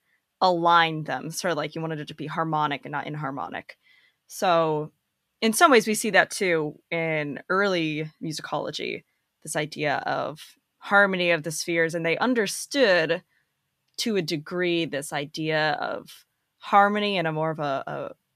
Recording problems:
none

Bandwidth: 14.5 kHz